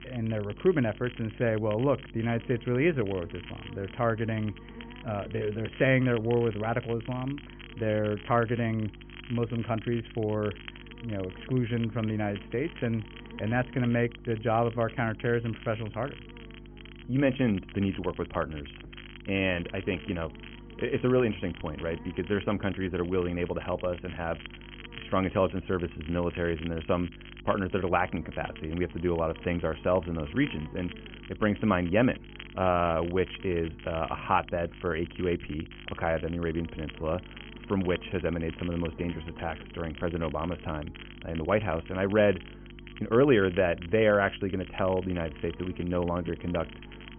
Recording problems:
high frequencies cut off; severe; nothing above 3 kHz
crackle, like an old record; noticeable; 20 dB below the speech
electrical hum; faint; throughout; 50 Hz, 25 dB below the speech

